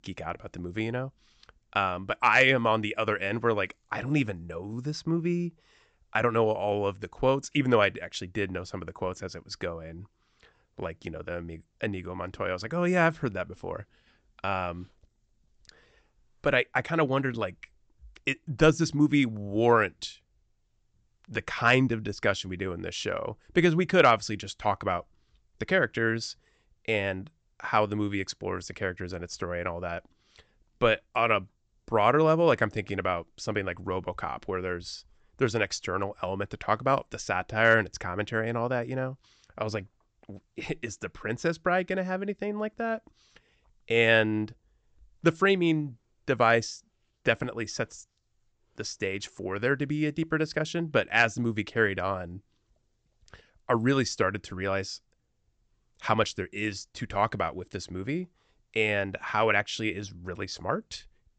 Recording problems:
high frequencies cut off; noticeable; nothing above 8 kHz

